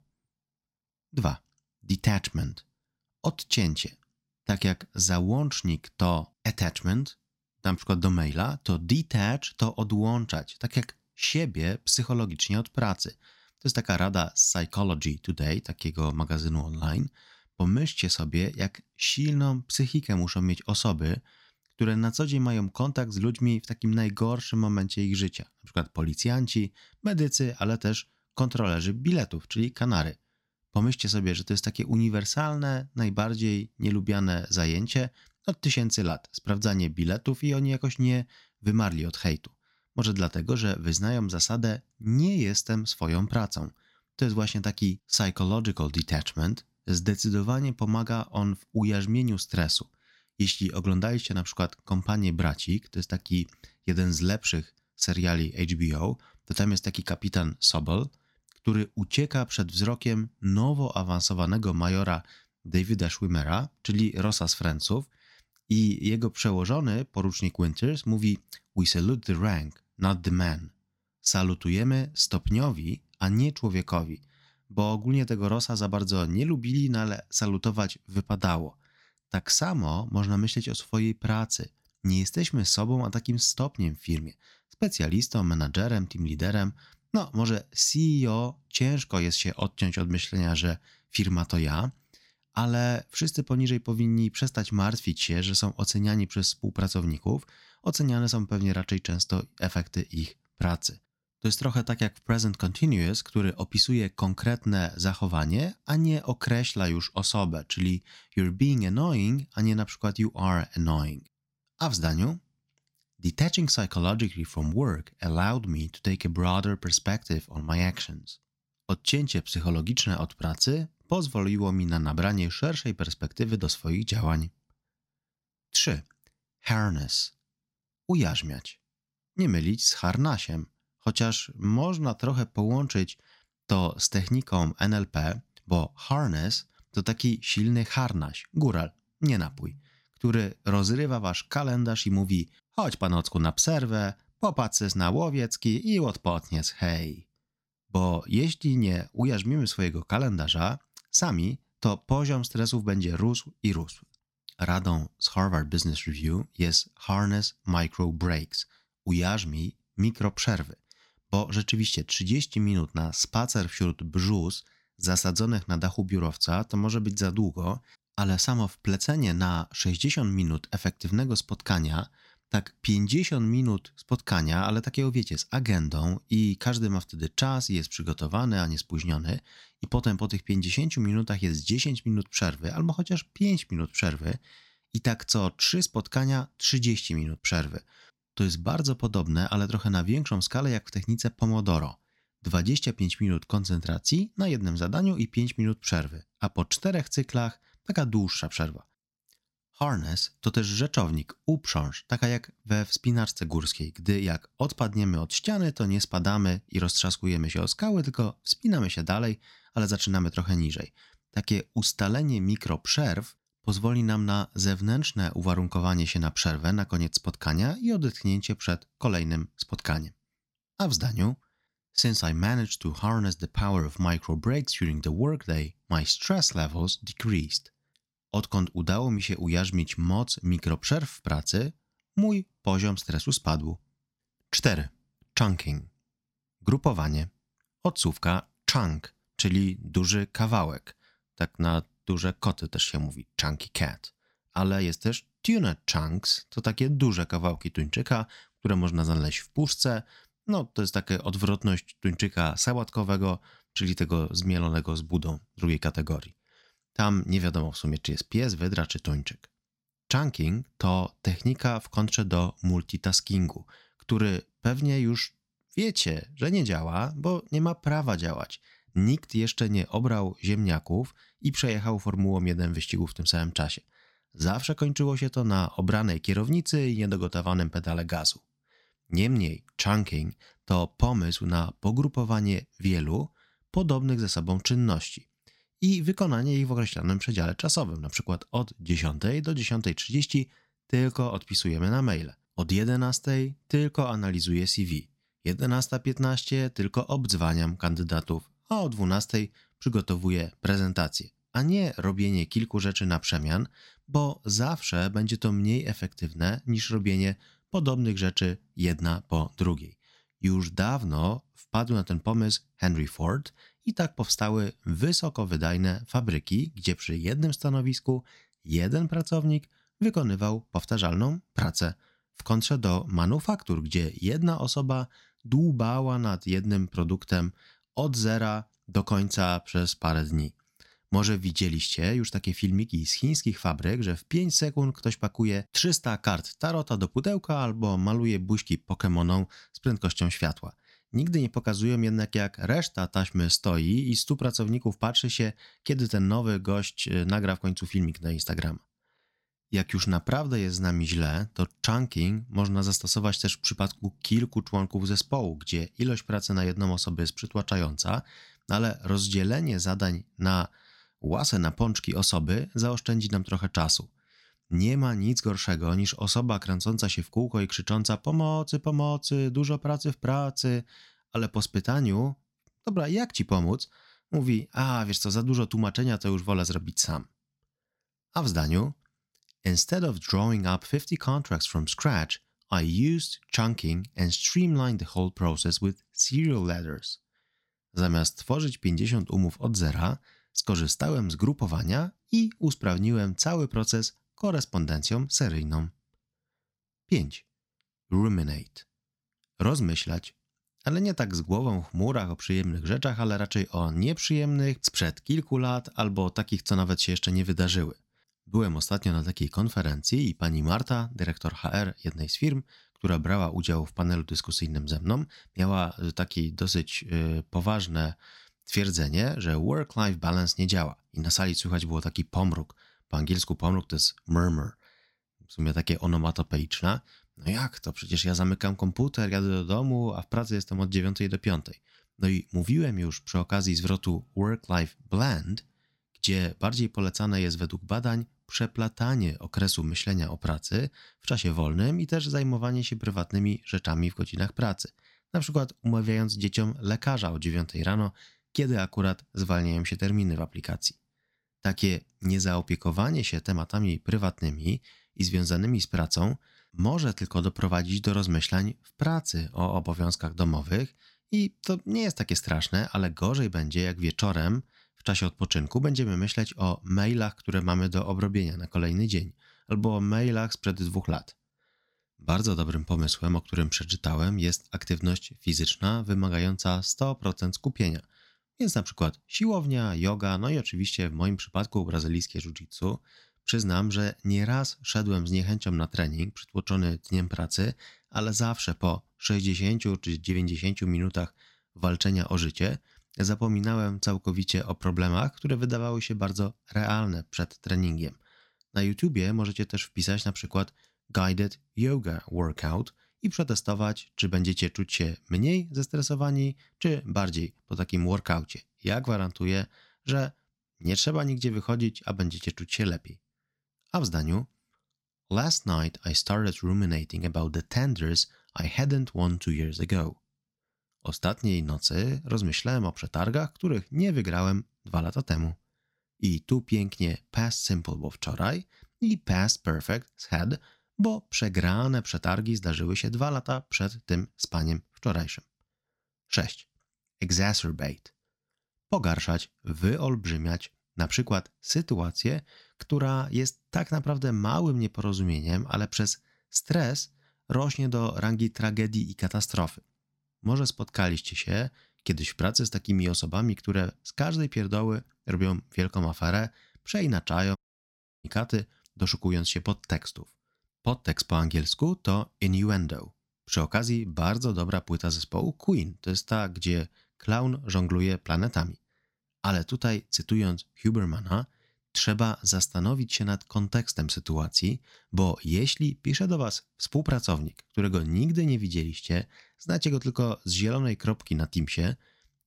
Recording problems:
audio cutting out; at 9:18 for 0.5 s

